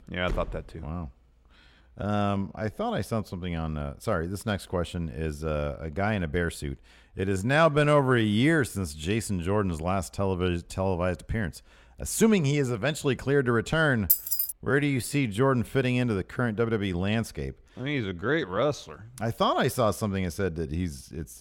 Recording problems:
door banging; faint; at 0.5 s; peak 10 dB below the speech
uneven, jittery; strongly; from 1.5 to 19 s
jangling keys; loud; at 14 s; peak 5 dB above the speech

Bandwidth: 16.5 kHz